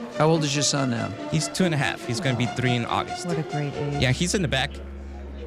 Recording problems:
background music; noticeable; throughout; 10 dB below the speech
murmuring crowd; noticeable; throughout; 20 dB below the speech

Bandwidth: 15 kHz